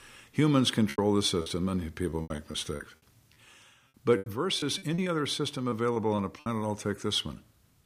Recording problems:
choppy; very; at 1 s, from 2 to 5 s and at 5.5 s; 17% of the speech affected

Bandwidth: 15 kHz